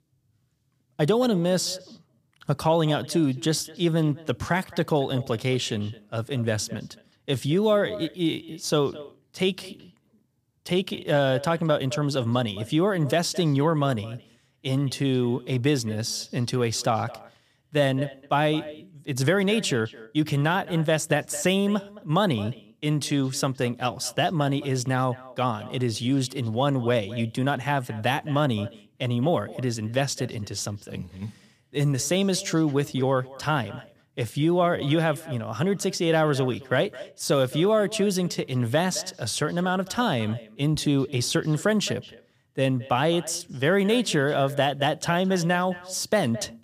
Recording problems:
echo of what is said; faint; throughout; 220 ms later, 20 dB below the speech

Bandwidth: 15 kHz